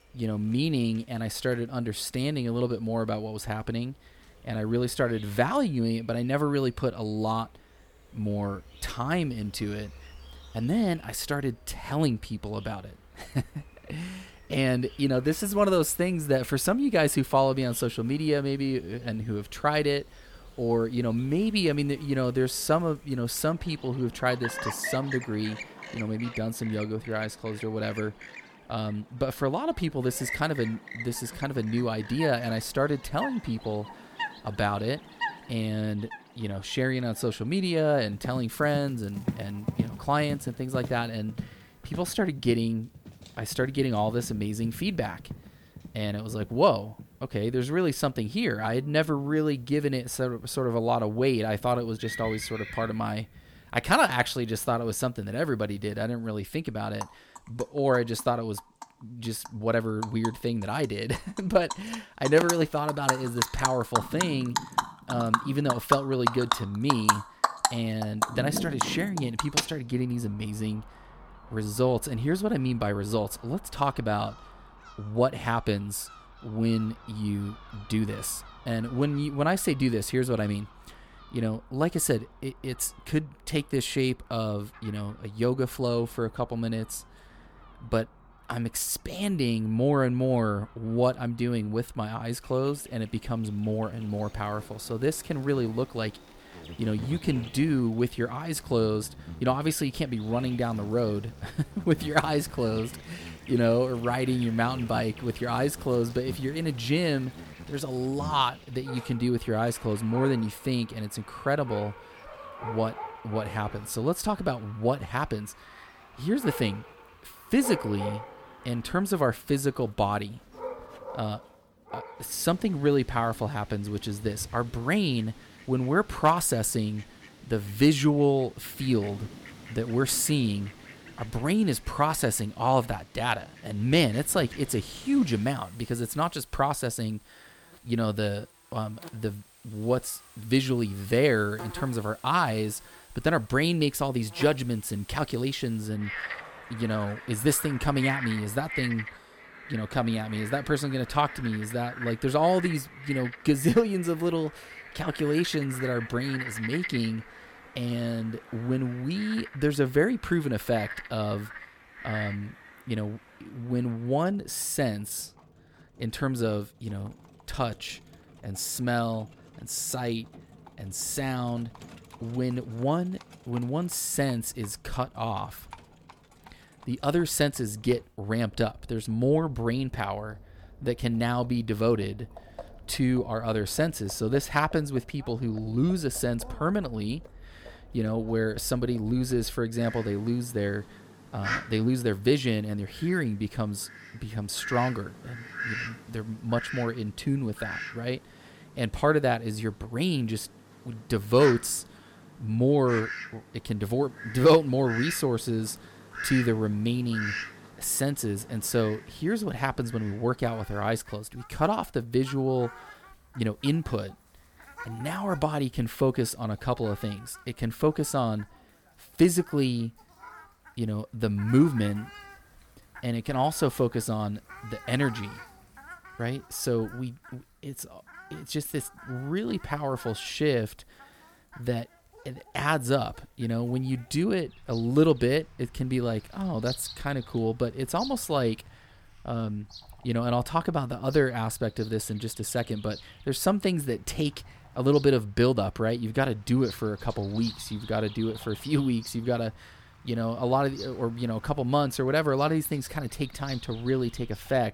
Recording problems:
animal sounds; noticeable; throughout; 10 dB below the speech

